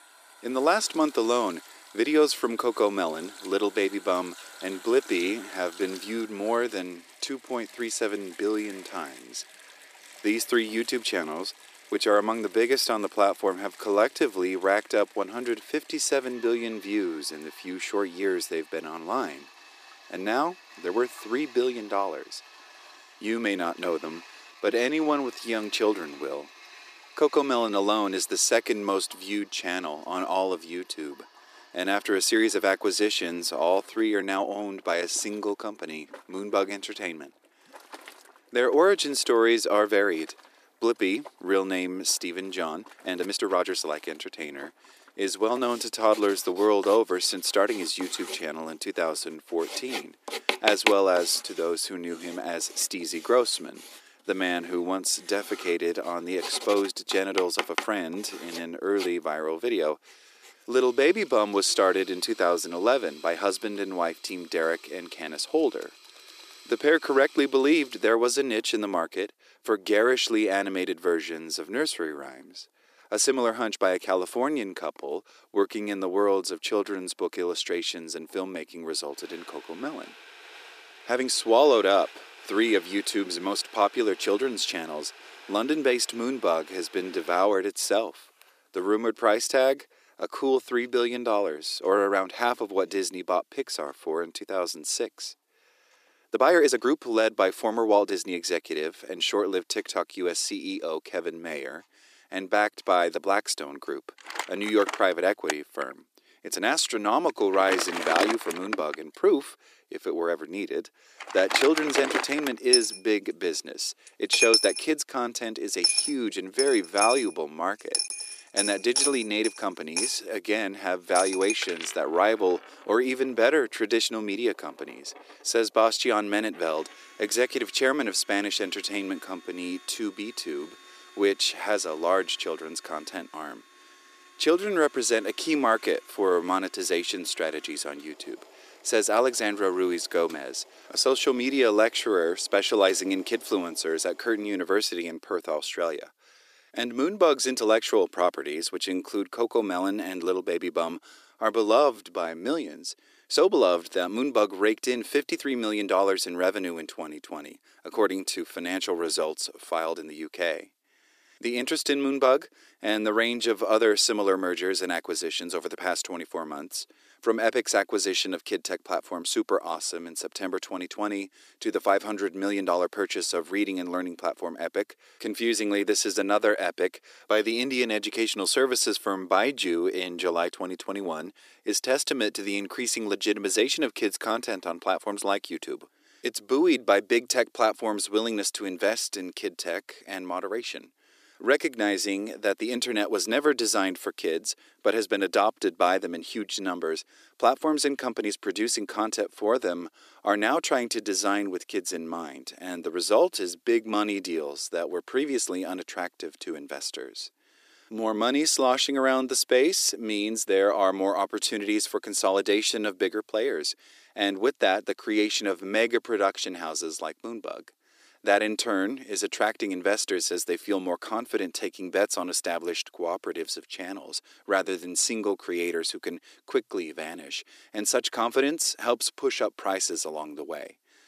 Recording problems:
thin; very; fading below 300 Hz
household noises; loud; until 2:24; 7 dB below the speech
uneven, jittery; strongly; from 21 s to 2:40

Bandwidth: 14.5 kHz